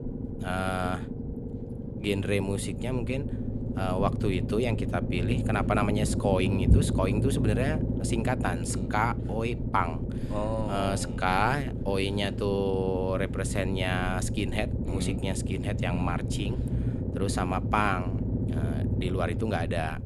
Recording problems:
low rumble; loud; throughout; 8 dB below the speech

